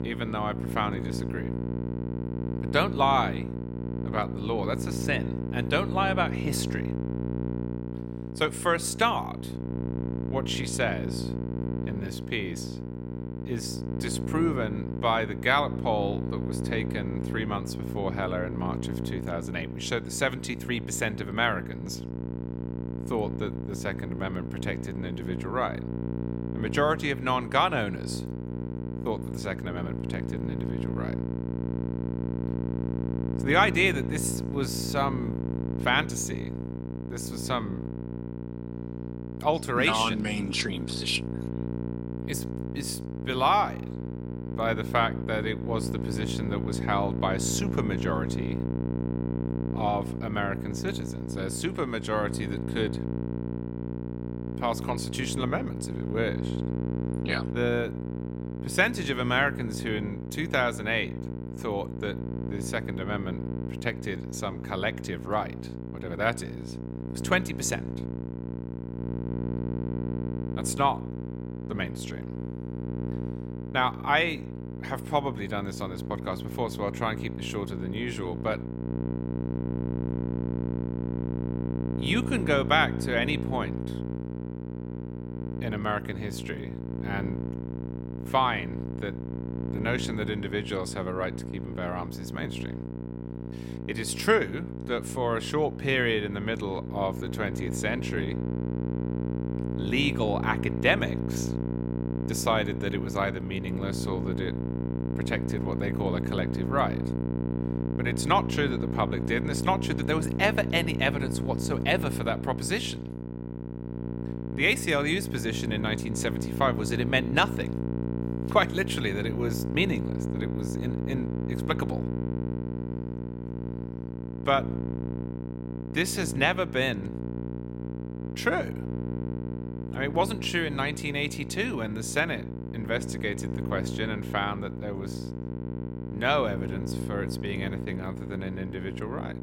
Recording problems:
electrical hum; noticeable; throughout; 60 Hz, 10 dB below the speech

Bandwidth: 16 kHz